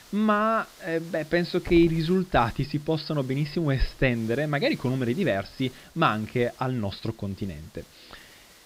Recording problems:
high frequencies cut off; noticeable; nothing above 5.5 kHz
hiss; faint; throughout; 20 dB below the speech

